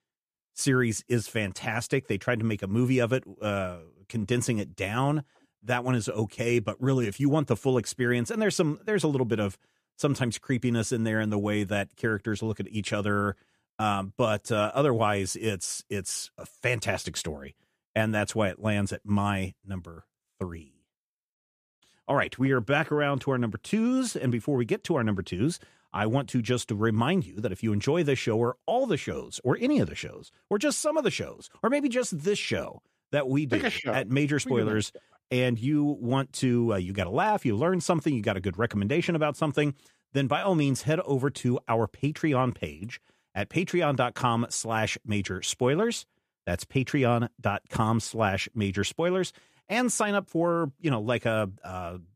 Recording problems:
none

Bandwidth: 14.5 kHz